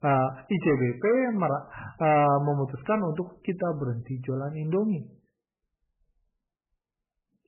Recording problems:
garbled, watery; badly; nothing above 3 kHz
distortion; slight; 10 dB below the speech

